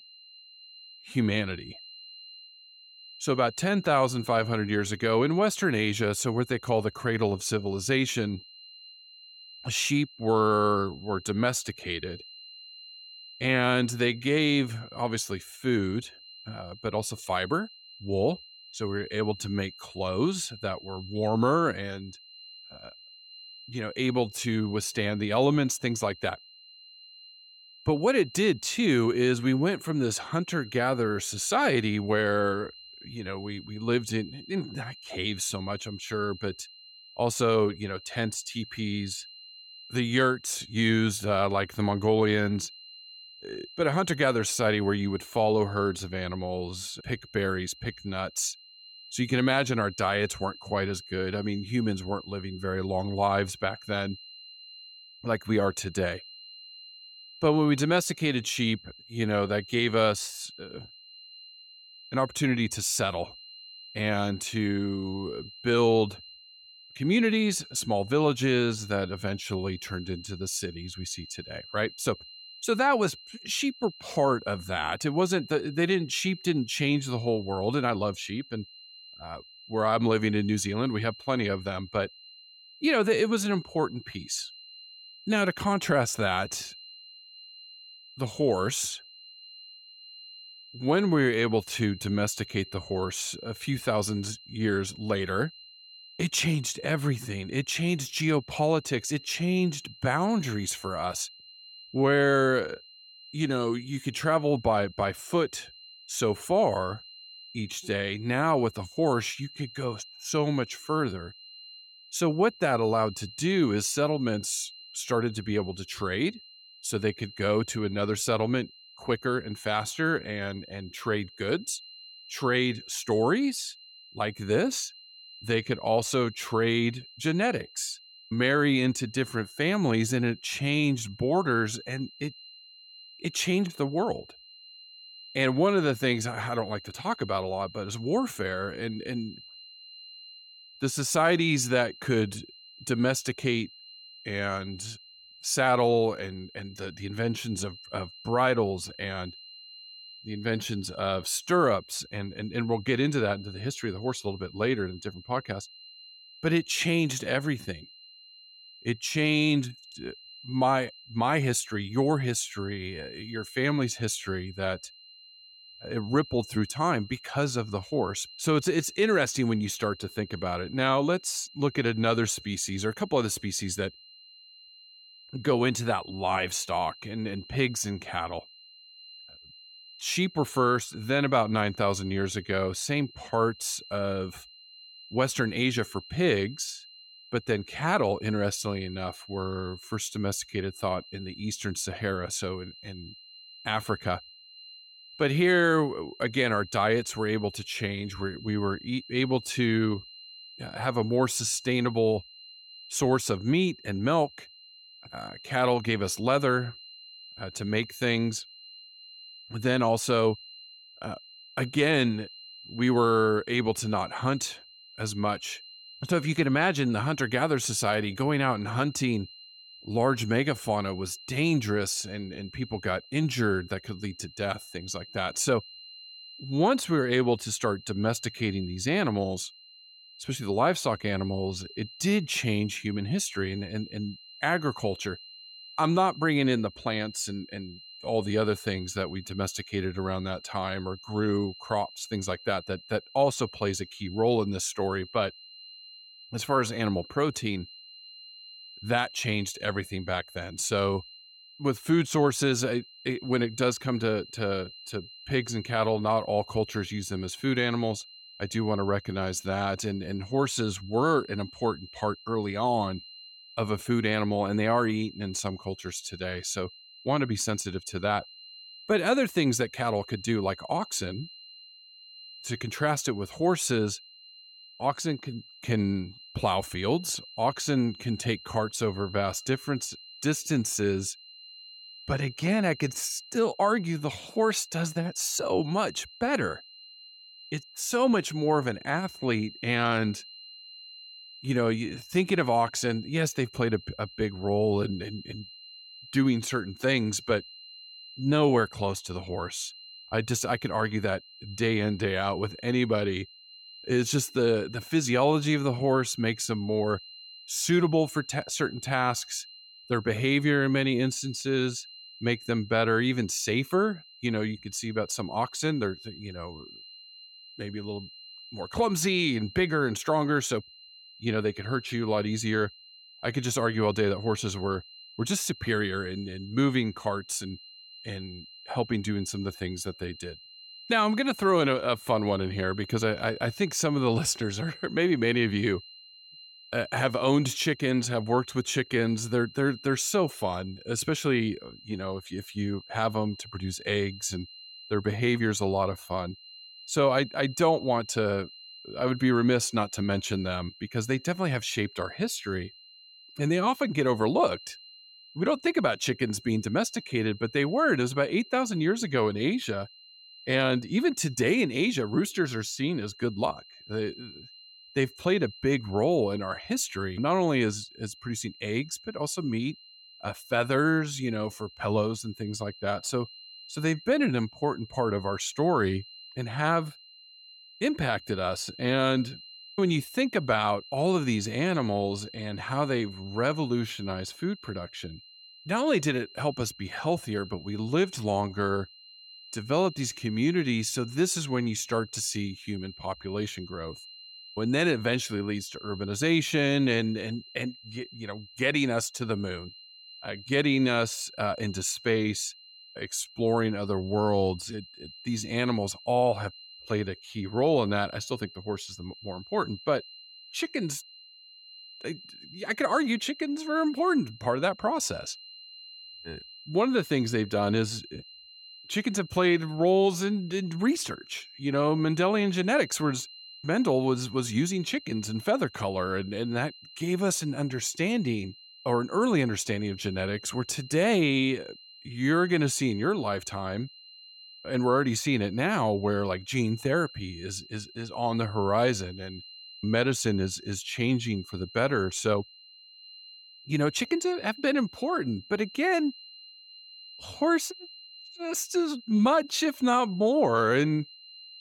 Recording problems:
high-pitched whine; noticeable; throughout; 4 kHz, 20 dB below the speech

